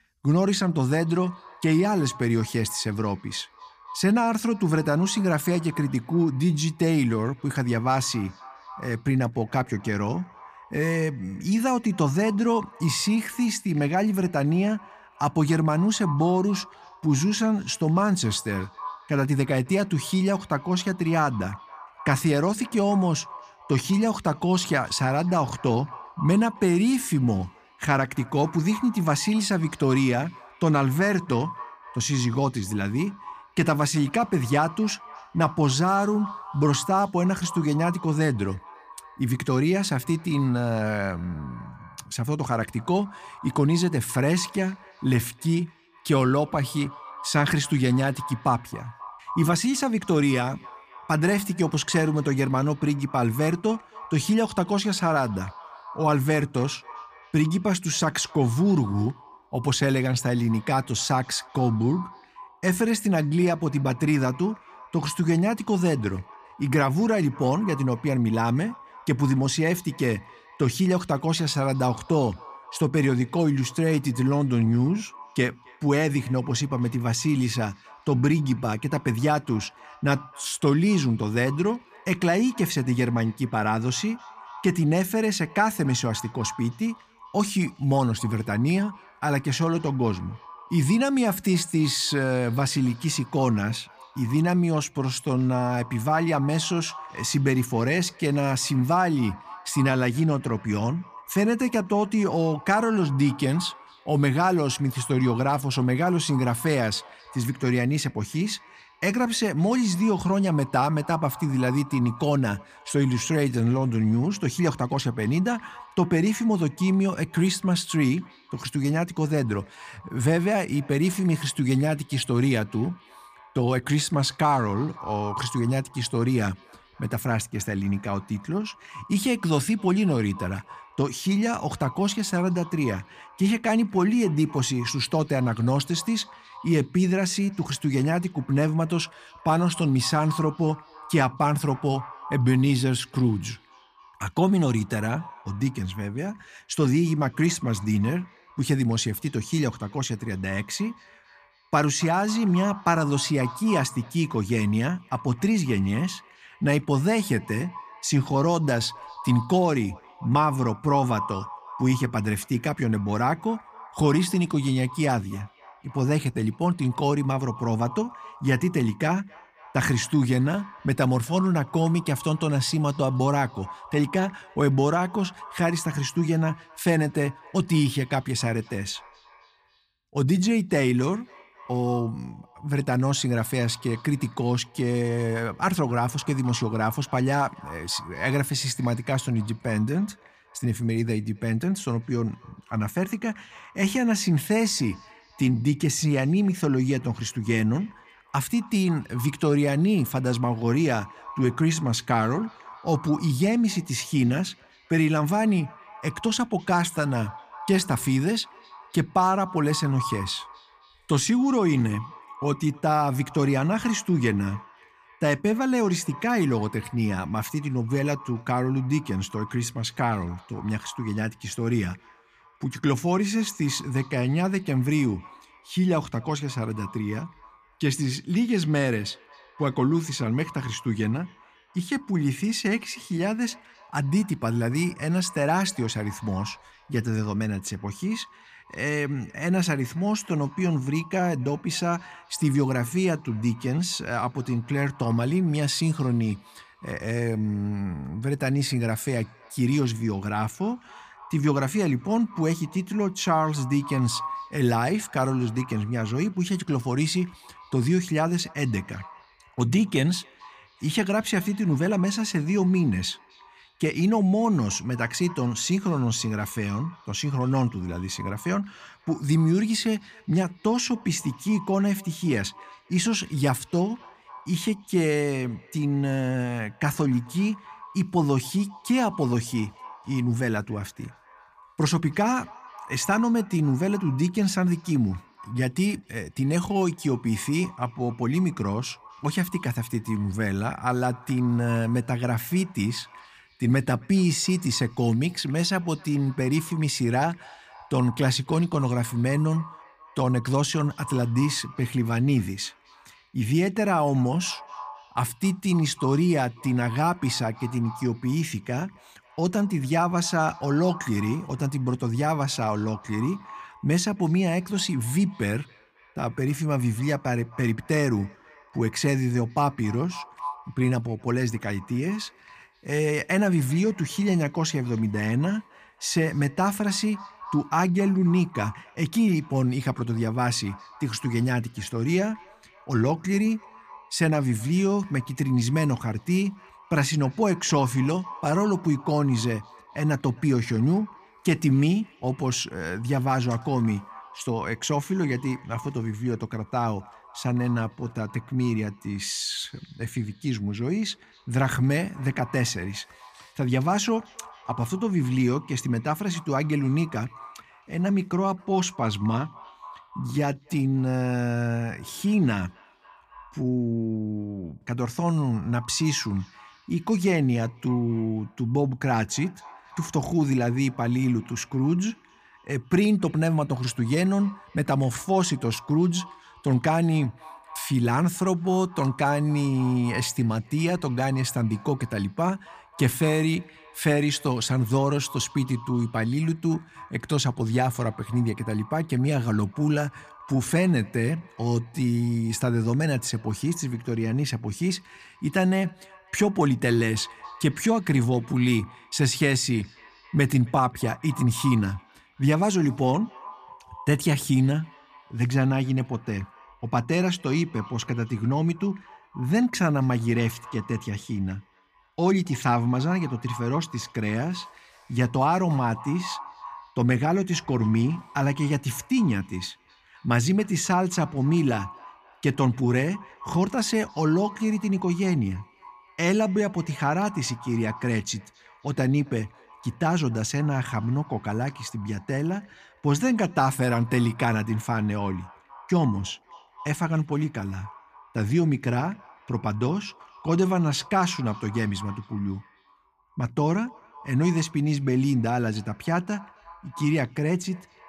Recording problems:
echo of what is said; faint; throughout; 270 ms later, 20 dB below the speech

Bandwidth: 15 kHz